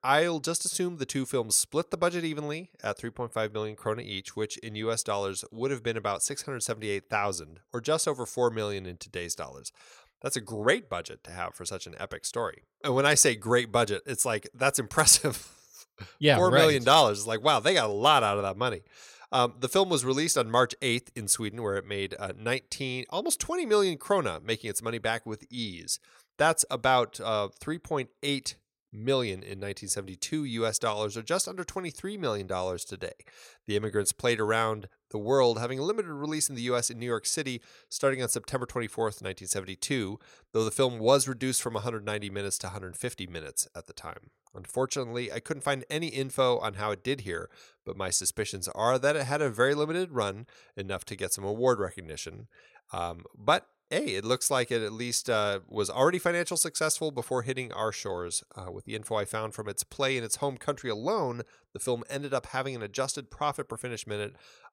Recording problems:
none

